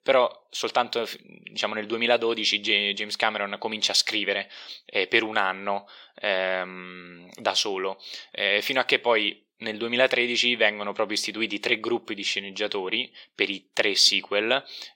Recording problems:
thin; somewhat; fading below 400 Hz

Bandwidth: 16.5 kHz